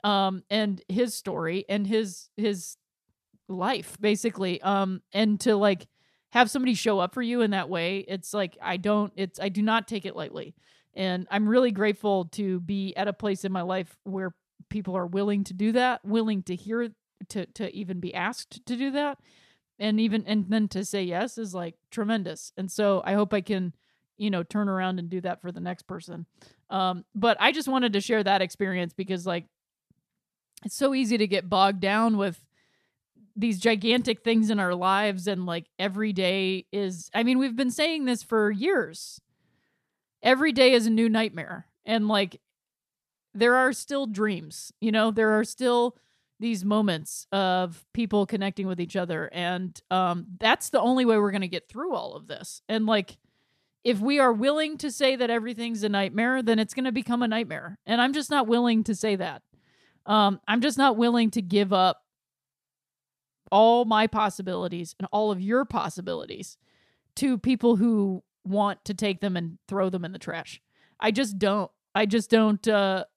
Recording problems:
none

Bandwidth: 14.5 kHz